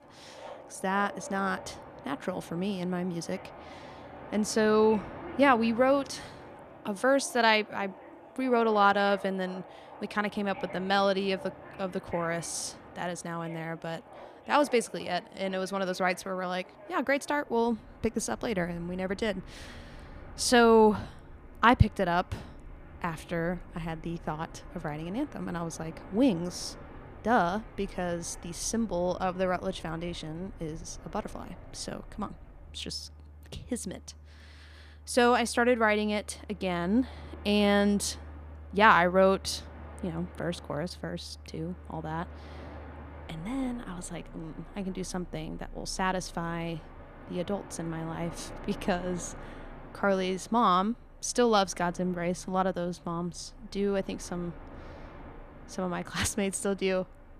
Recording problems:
train or aircraft noise; noticeable; throughout; 20 dB below the speech

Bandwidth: 14.5 kHz